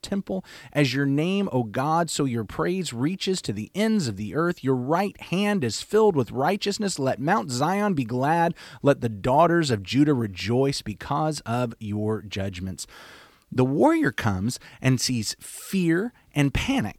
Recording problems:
none

